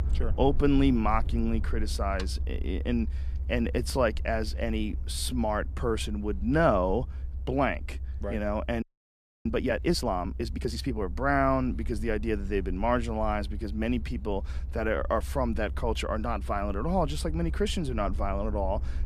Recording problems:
low rumble; faint; throughout; 25 dB below the speech
audio freezing; at 9 s for 0.5 s

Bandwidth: 14.5 kHz